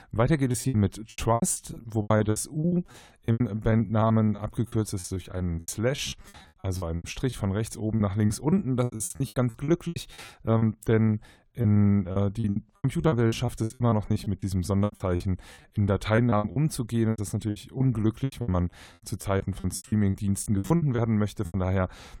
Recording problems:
choppy; very; 19% of the speech affected

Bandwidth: 17.5 kHz